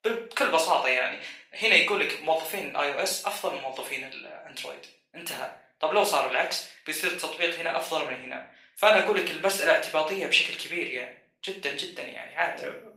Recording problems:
off-mic speech; far
thin; very; fading below 550 Hz
room echo; slight; dies away in 0.4 s
garbled, watery; slightly; nothing above 15.5 kHz

